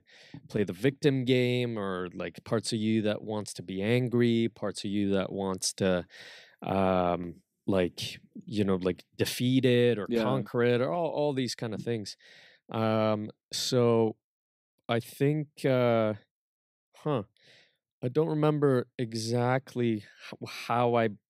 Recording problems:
none

